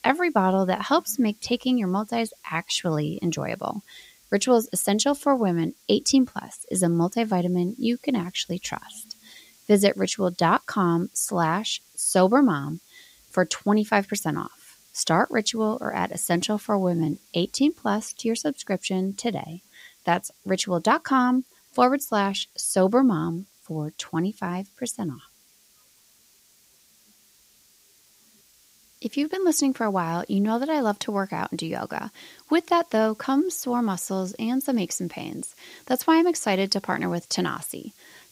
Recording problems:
hiss; faint; throughout; 30 dB below the speech

